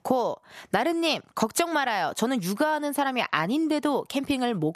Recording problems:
squashed, flat; heavily

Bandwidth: 14 kHz